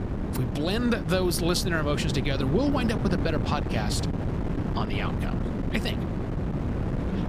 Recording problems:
wind noise on the microphone; heavy; 6 dB below the speech

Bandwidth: 15 kHz